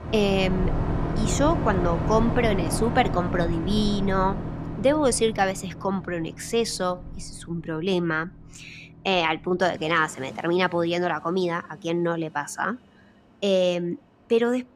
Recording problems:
train or aircraft noise; loud; throughout; 5 dB below the speech

